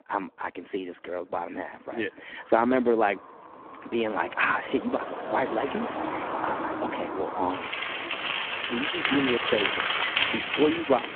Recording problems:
phone-call audio; poor line
traffic noise; loud; throughout; as loud as the speech

